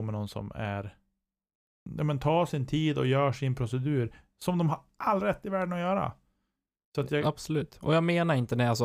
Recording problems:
abrupt cut into speech; at the start and the end

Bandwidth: 15.5 kHz